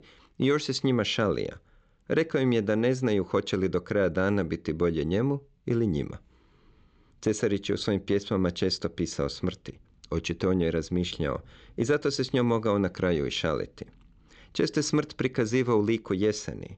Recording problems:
high frequencies cut off; noticeable; nothing above 8 kHz

